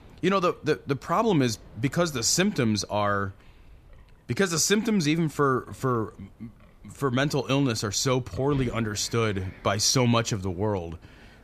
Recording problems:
wind in the background; faint; throughout; 25 dB below the speech

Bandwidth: 14.5 kHz